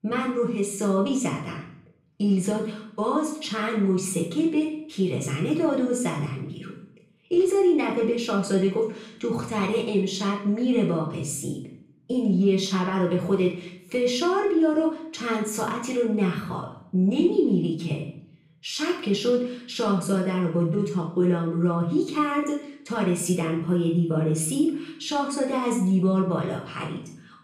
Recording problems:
off-mic speech; far
room echo; slight; dies away in 0.5 s

